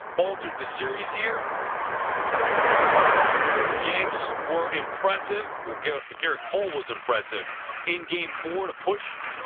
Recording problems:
phone-call audio; poor line; nothing above 3.5 kHz
traffic noise; very loud; throughout; 3 dB above the speech

